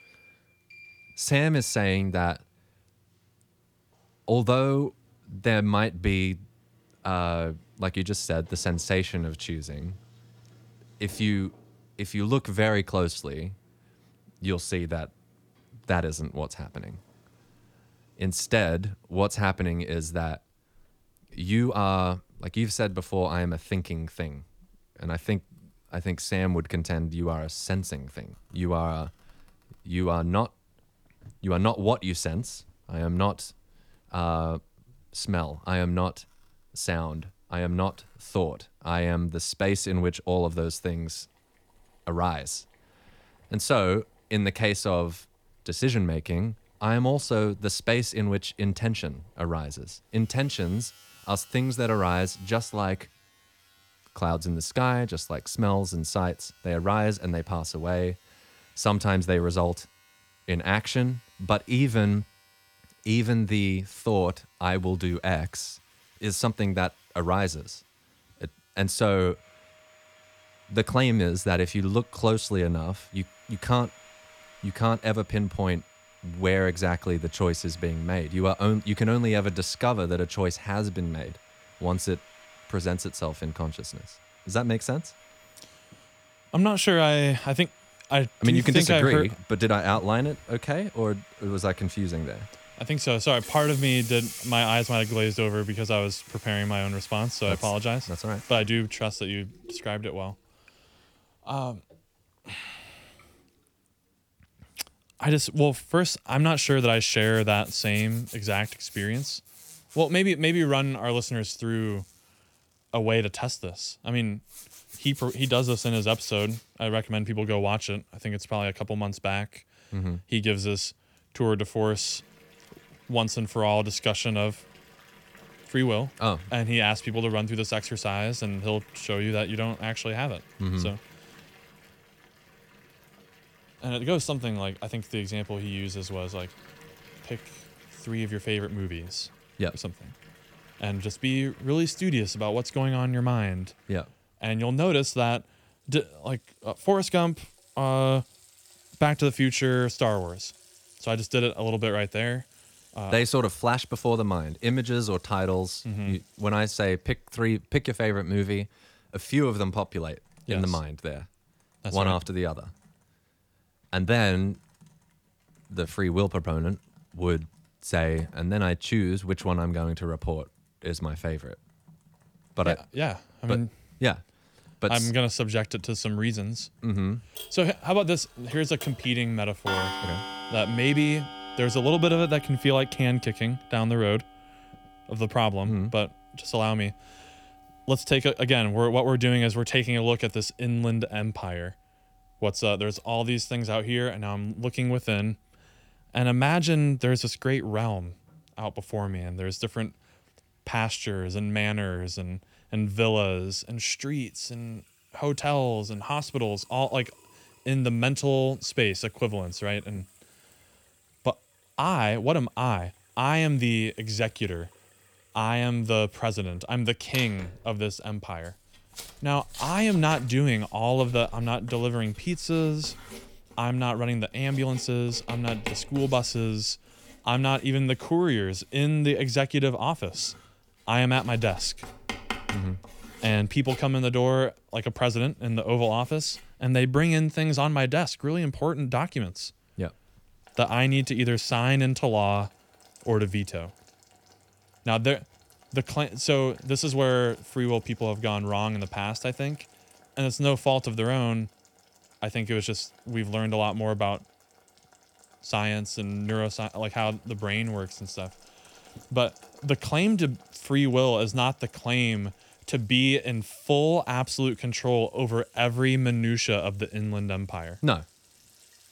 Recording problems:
household noises; noticeable; throughout; 20 dB below the speech

